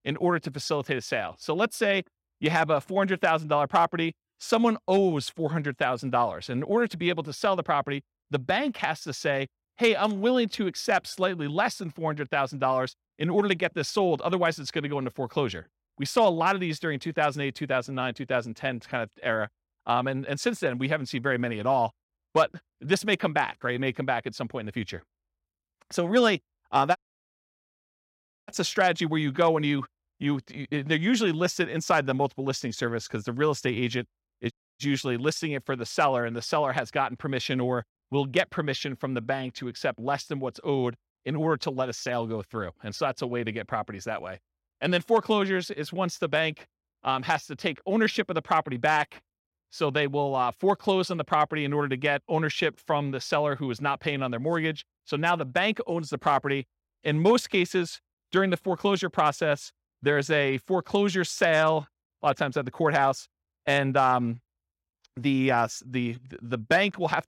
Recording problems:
audio cutting out; at 27 s for 1.5 s and at 35 s

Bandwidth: 16 kHz